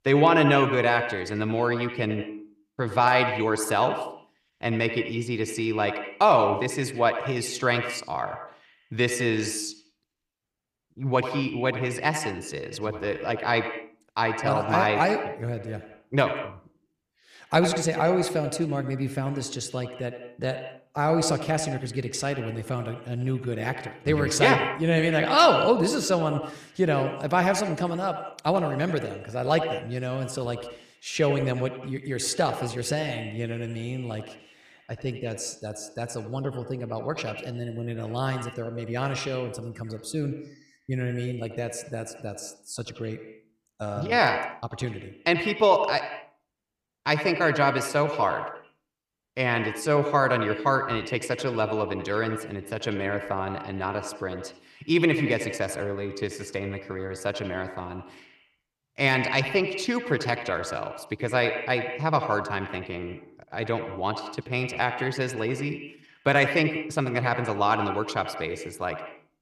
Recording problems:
echo of what is said; strong; throughout; 80 ms later, 7 dB below the speech

